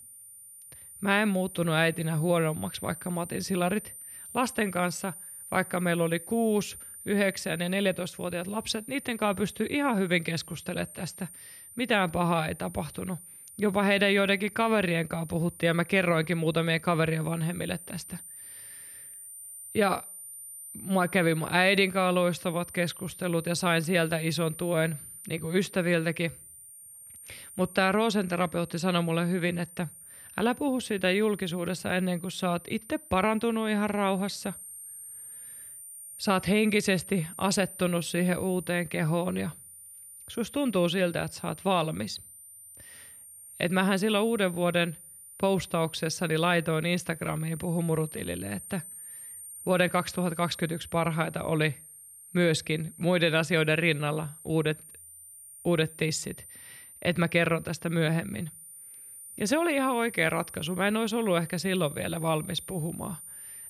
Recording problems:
high-pitched whine; noticeable; throughout; 9.5 kHz, 15 dB below the speech

